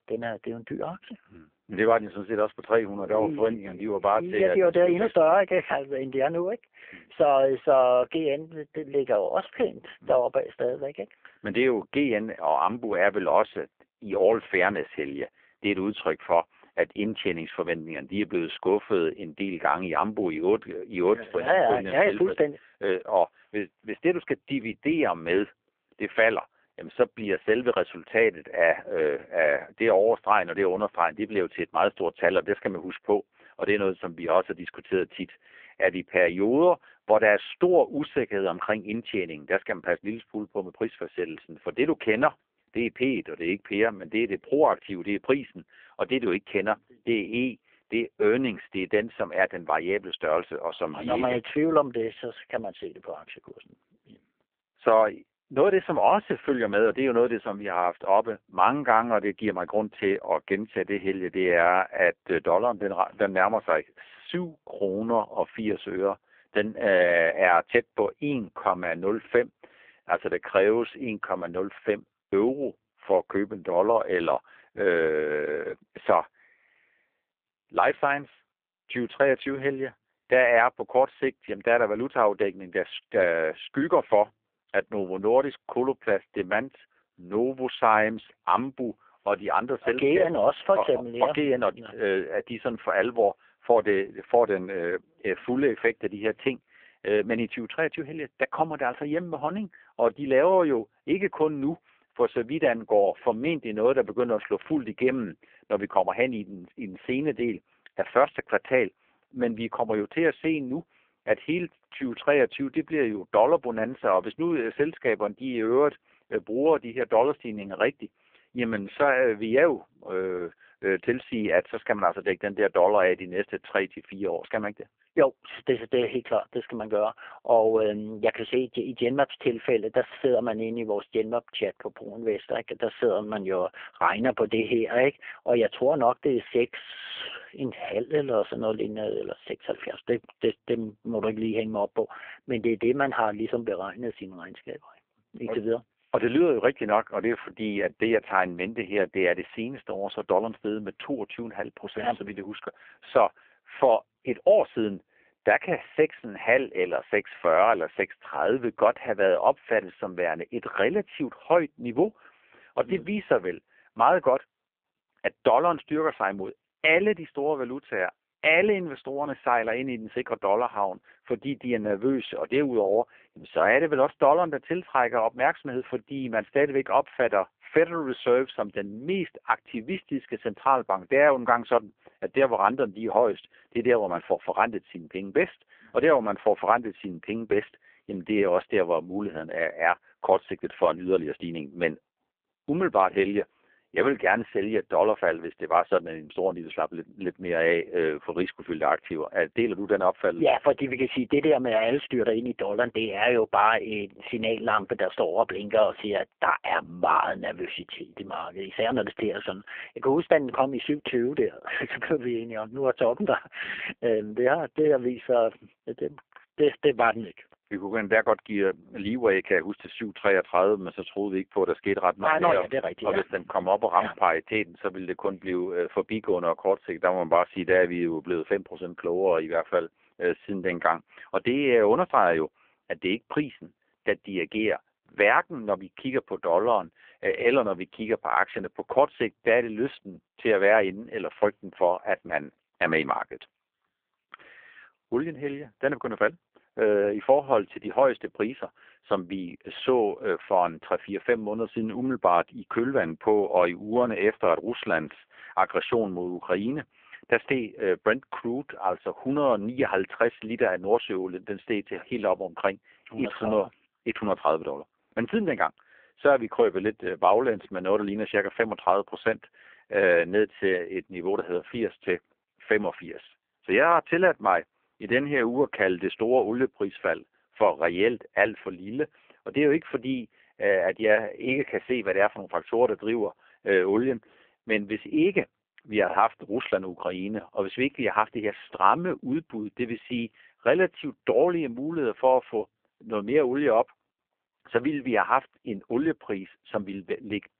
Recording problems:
phone-call audio; poor line

